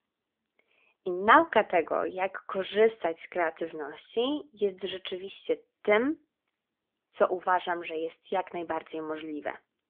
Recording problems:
phone-call audio; nothing above 3.5 kHz

